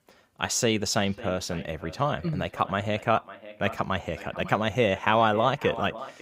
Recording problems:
echo of what is said; noticeable; throughout; 550 ms later, 15 dB below the speech

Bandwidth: 15.5 kHz